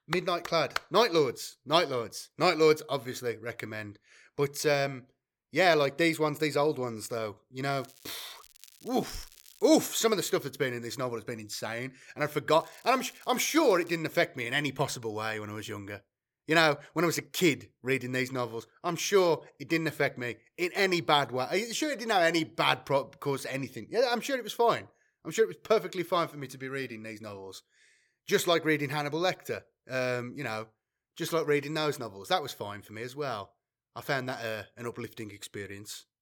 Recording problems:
crackling; faint; from 8 to 10 s and from 13 to 14 s; 25 dB below the speech

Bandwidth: 17.5 kHz